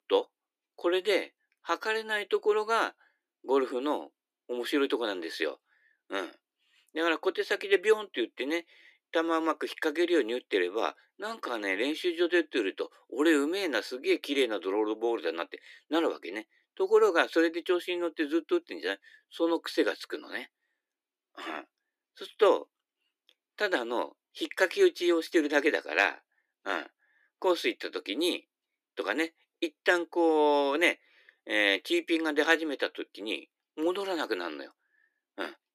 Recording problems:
thin; somewhat; fading below 300 Hz

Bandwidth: 14.5 kHz